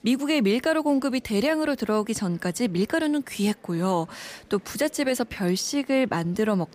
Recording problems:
murmuring crowd; faint; throughout; 30 dB below the speech

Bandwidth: 15 kHz